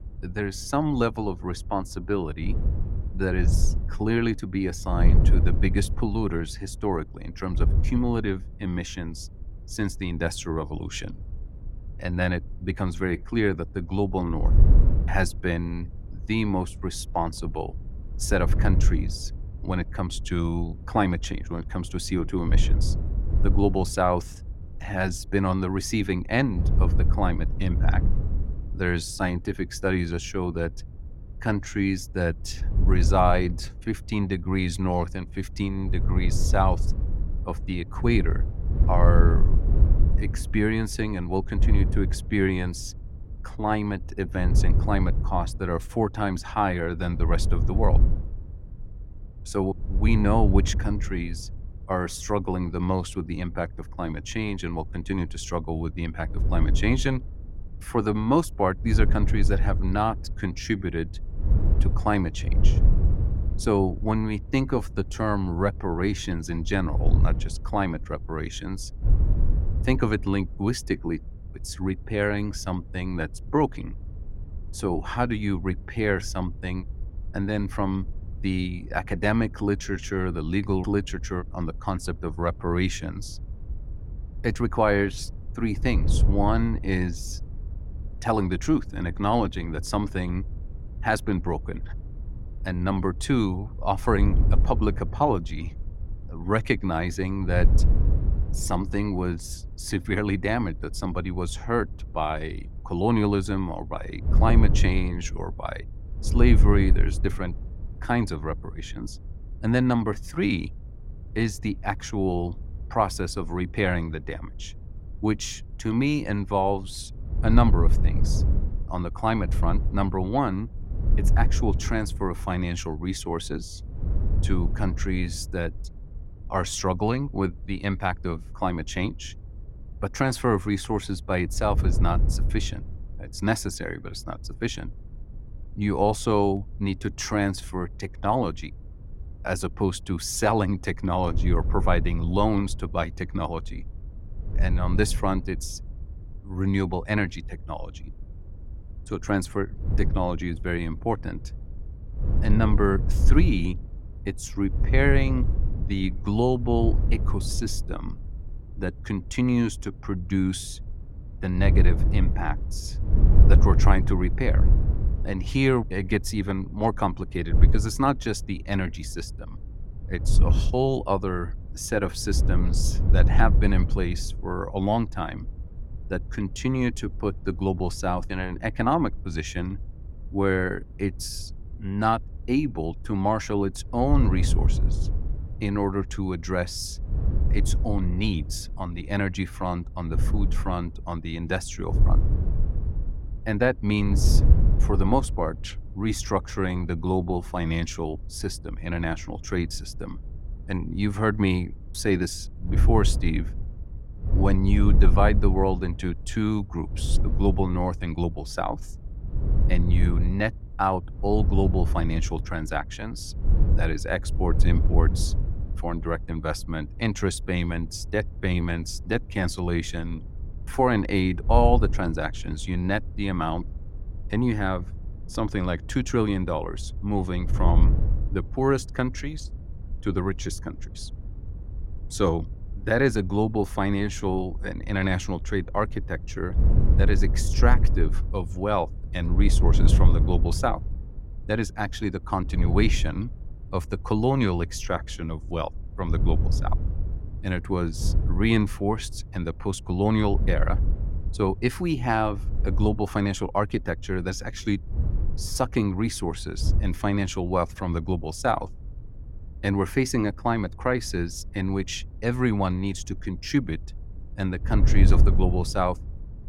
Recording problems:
wind noise on the microphone; occasional gusts; 15 dB below the speech

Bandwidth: 16.5 kHz